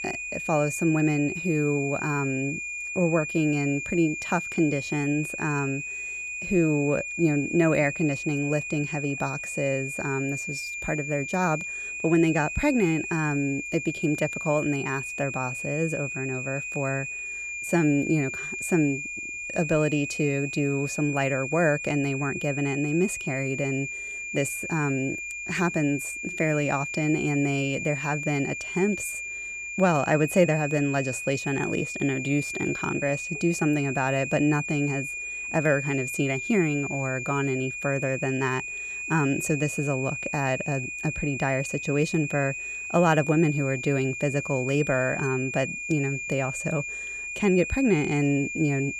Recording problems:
high-pitched whine; loud; throughout; 2.5 kHz, 5 dB below the speech

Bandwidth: 15 kHz